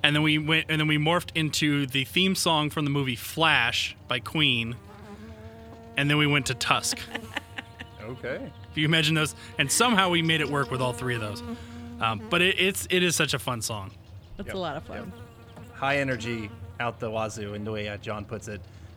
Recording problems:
electrical hum; faint; throughout; 60 Hz, 25 dB below the speech

